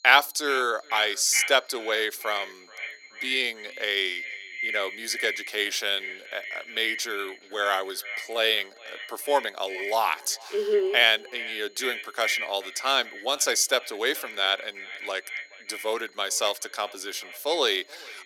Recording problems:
echo of what is said; strong; throughout; 430 ms later, 10 dB below the speech
thin; very; fading below 350 Hz
high-pitched whine; faint; throughout; 4 kHz, 30 dB below the speech

